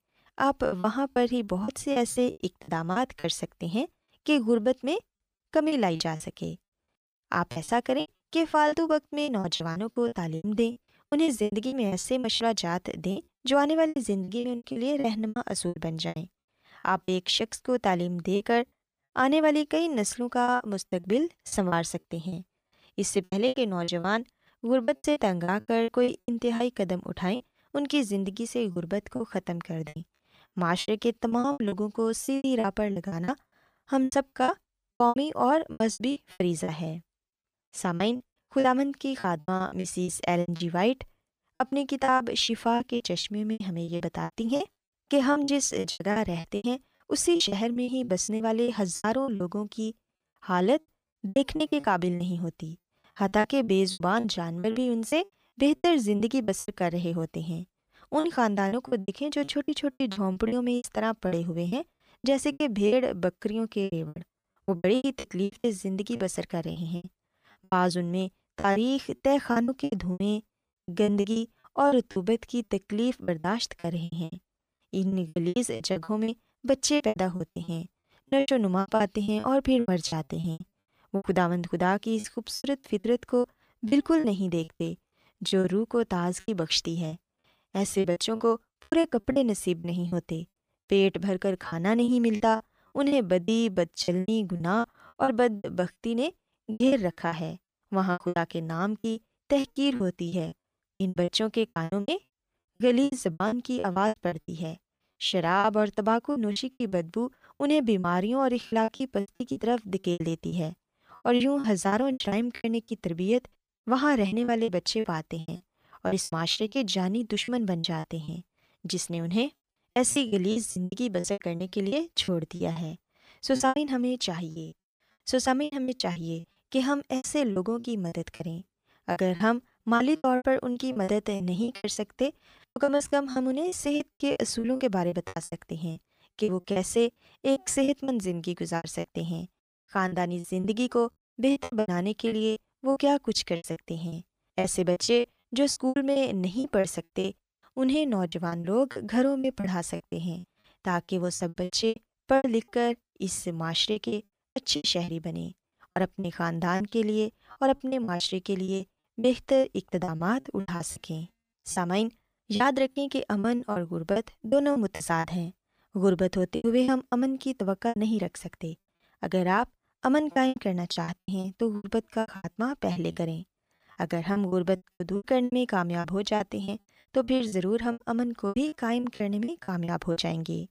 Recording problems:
choppy; very; 17% of the speech affected

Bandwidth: 15 kHz